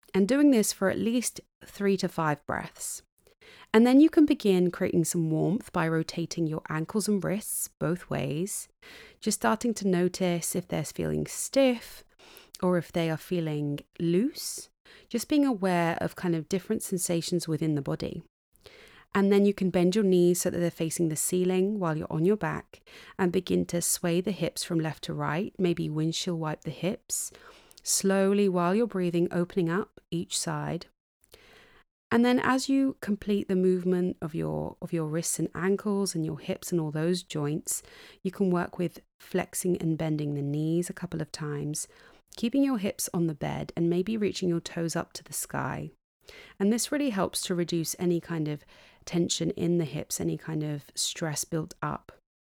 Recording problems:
none

